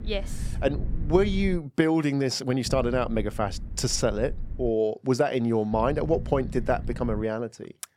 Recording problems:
low rumble; faint; until 1.5 s, from 2.5 to 4.5 s and from 5.5 to 7 s; 20 dB below the speech

